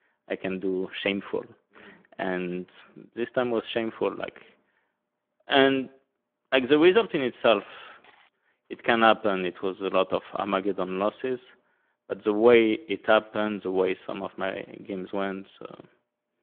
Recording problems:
phone-call audio; nothing above 3.5 kHz

